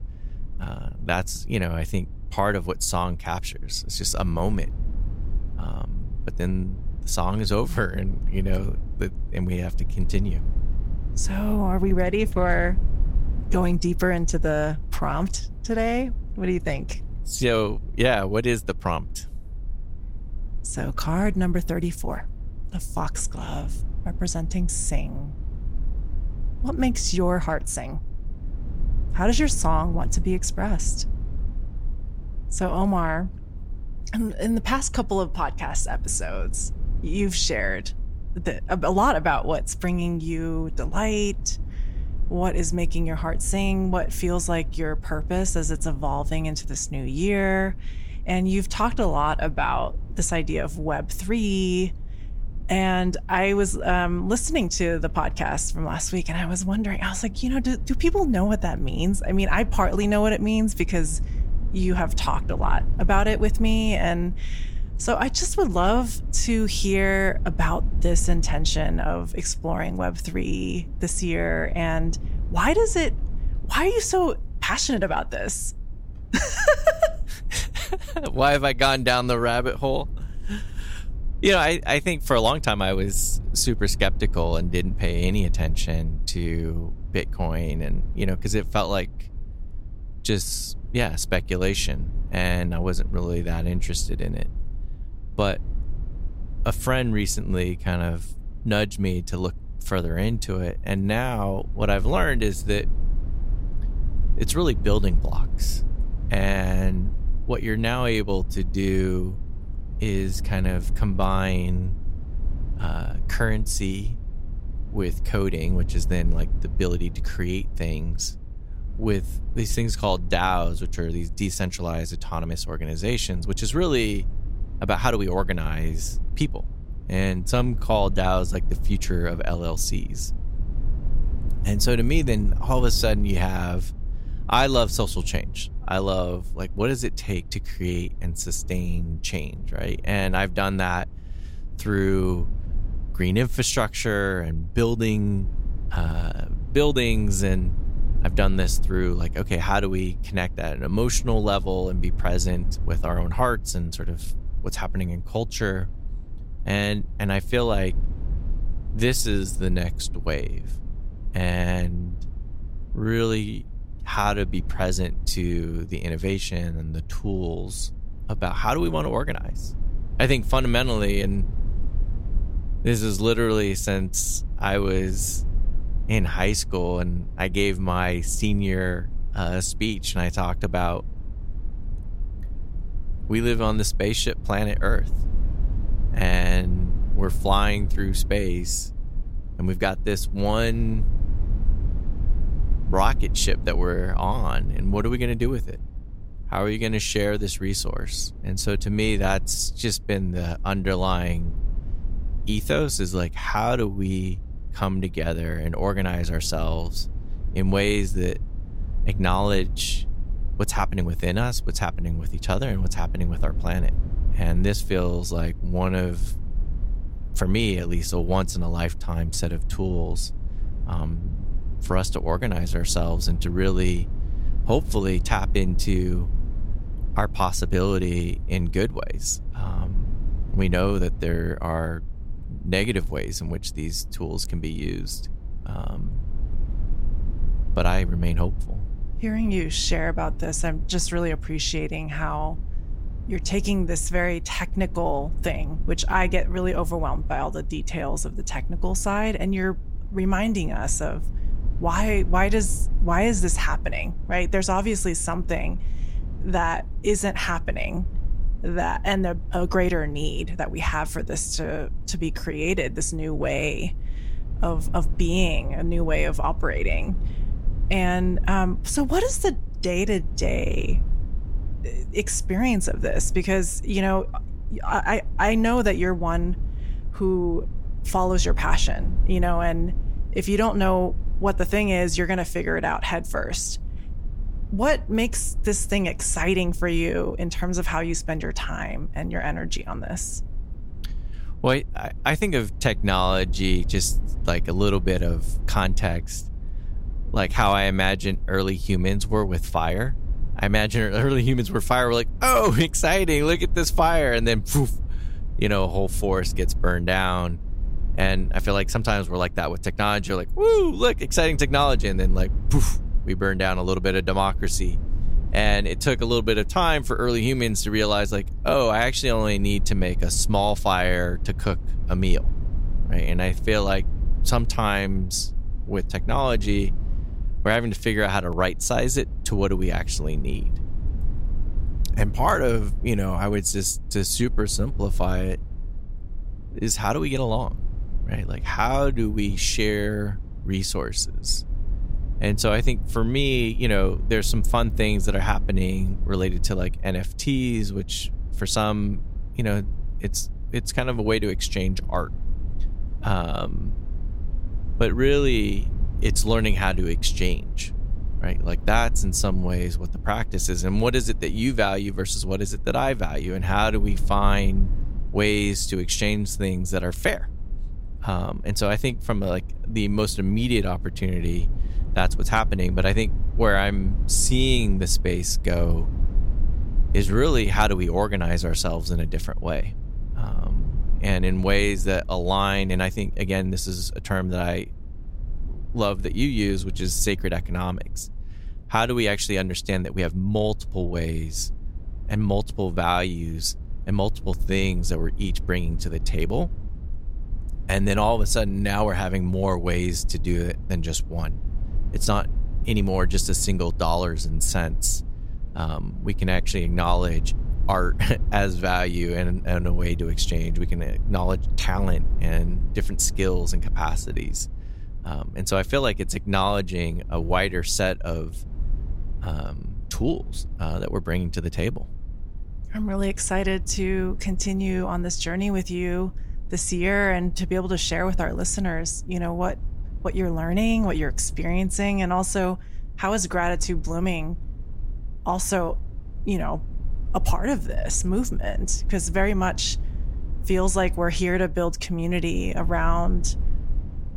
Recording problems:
low rumble; faint; throughout; 25 dB below the speech

